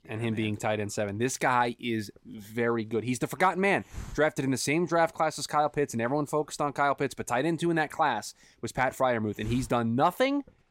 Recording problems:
hiss; faint; throughout; 20 dB below the speech

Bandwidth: 16 kHz